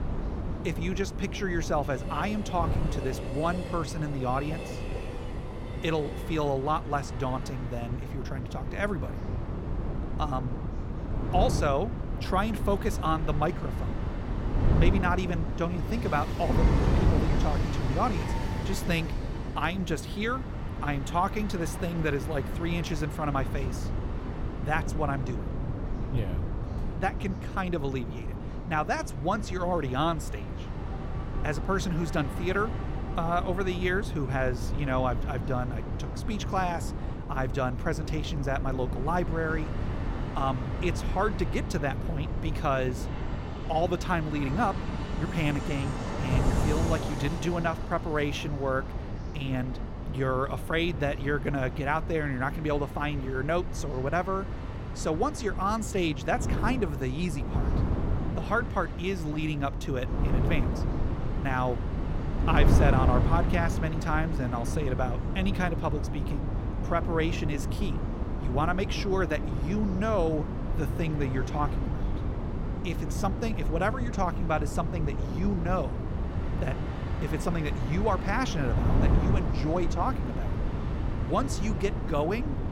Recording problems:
wind noise on the microphone; heavy; 9 dB below the speech
train or aircraft noise; noticeable; throughout; 15 dB below the speech
chatter from many people; faint; throughout; 25 dB below the speech

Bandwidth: 16.5 kHz